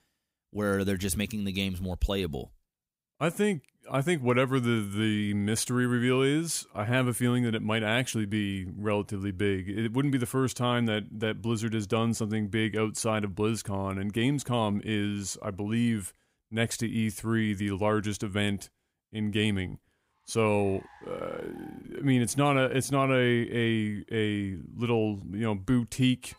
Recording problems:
traffic noise; faint; from 20 s on; 30 dB below the speech

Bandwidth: 15.5 kHz